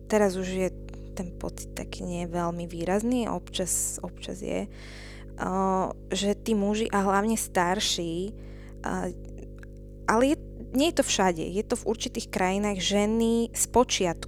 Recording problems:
electrical hum; faint; throughout; 50 Hz, 25 dB below the speech

